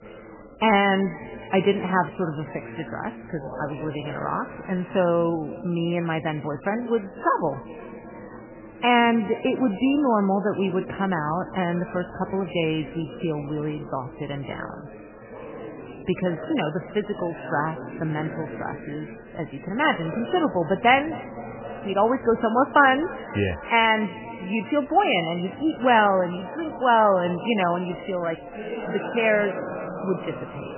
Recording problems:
garbled, watery; badly; nothing above 3 kHz
echo of what is said; faint; throughout; 260 ms later, 20 dB below the speech
background chatter; noticeable; throughout; 4 voices, 15 dB below the speech

